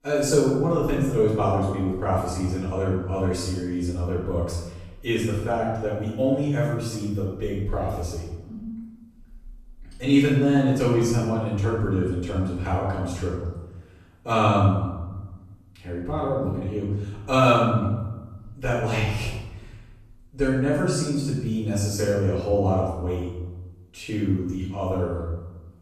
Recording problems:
off-mic speech; far
room echo; noticeable; dies away in 1 s

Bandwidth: 14 kHz